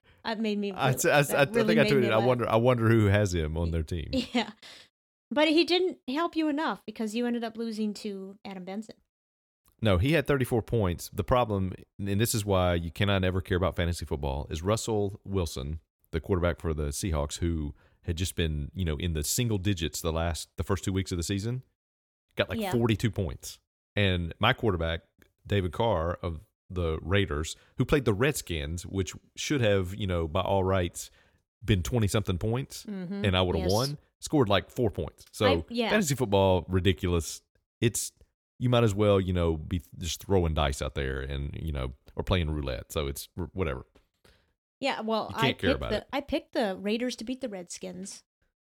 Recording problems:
none

